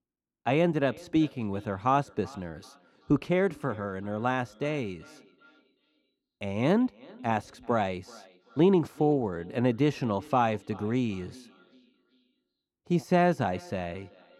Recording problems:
muffled; slightly; fading above 1.5 kHz
echo of what is said; faint; throughout; 380 ms later, 25 dB below the speech

